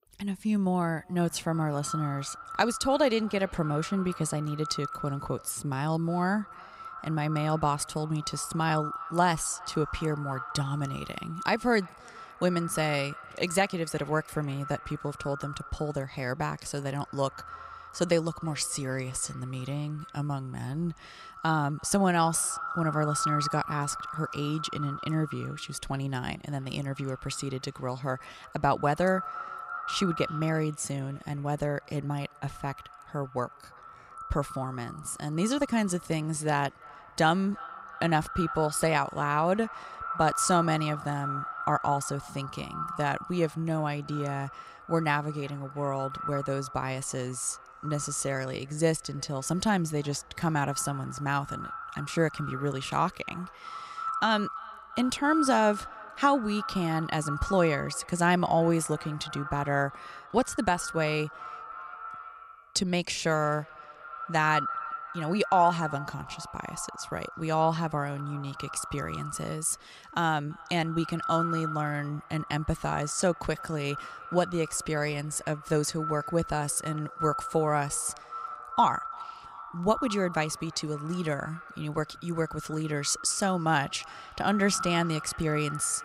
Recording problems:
echo of what is said; strong; throughout; 340 ms later, 10 dB below the speech

